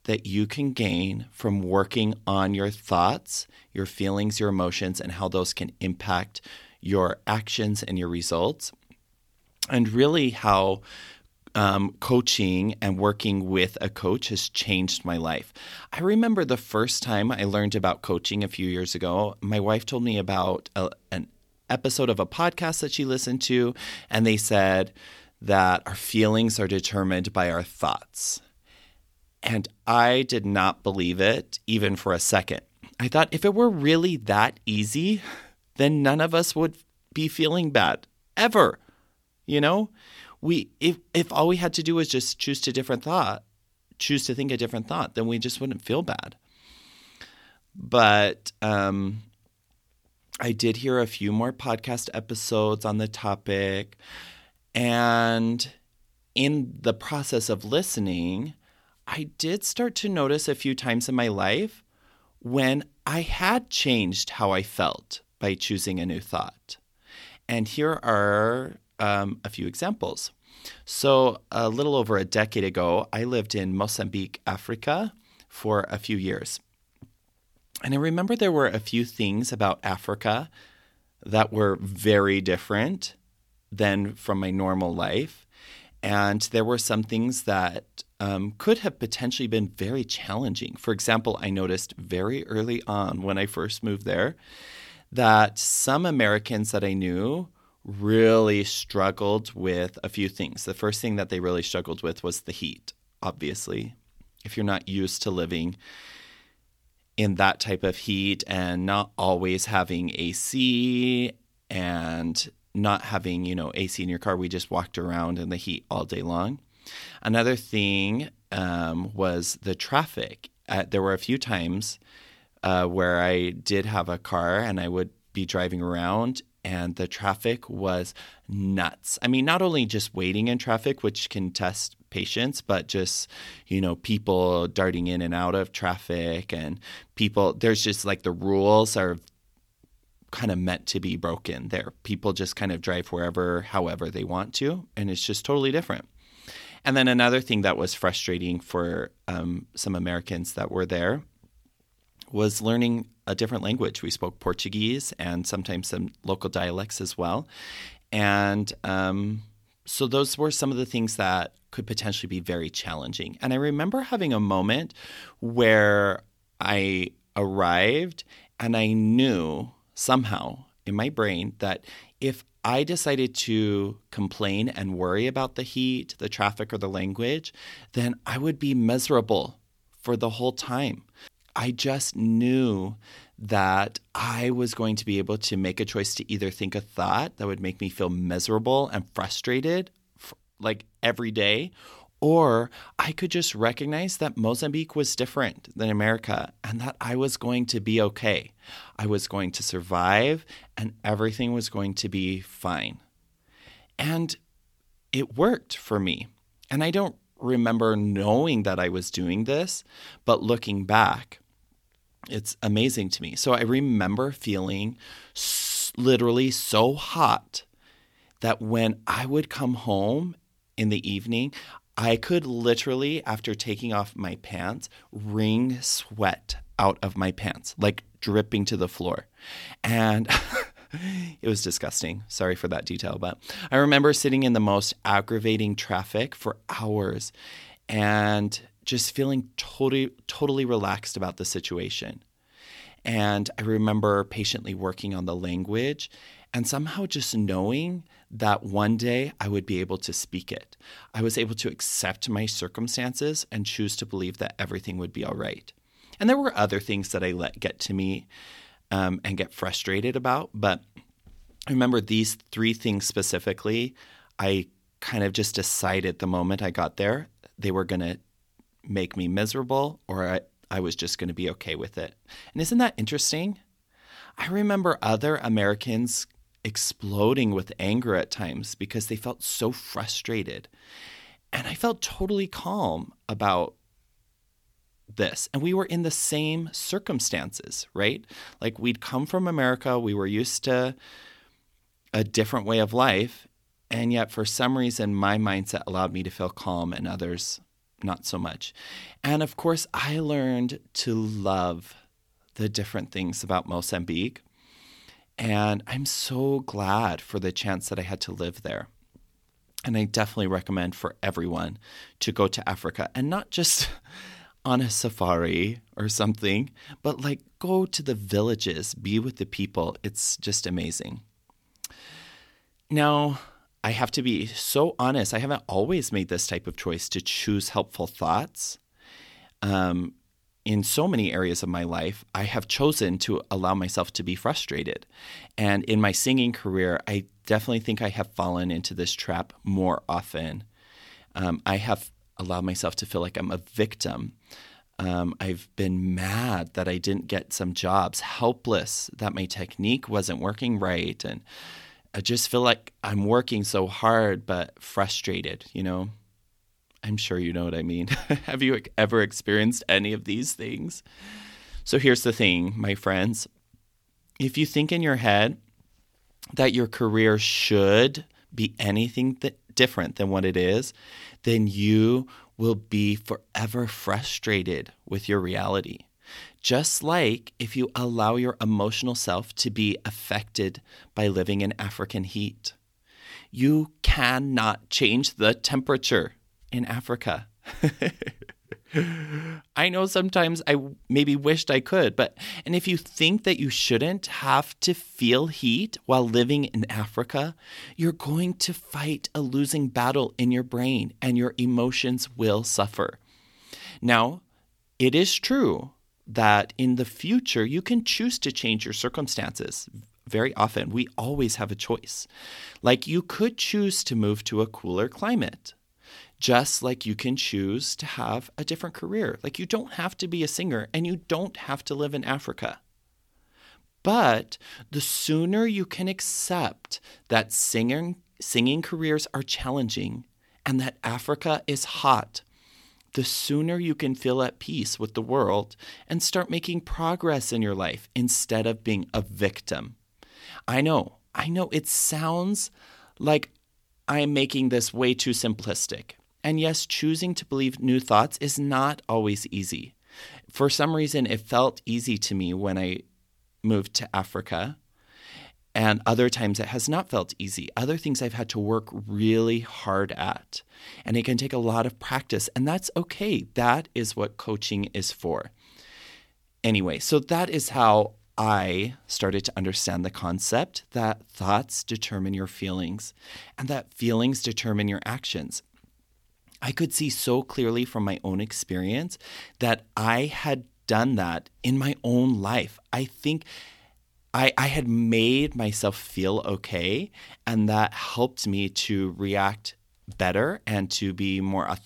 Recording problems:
none

